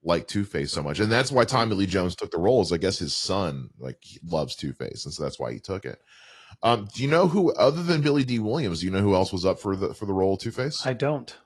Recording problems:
garbled, watery; slightly

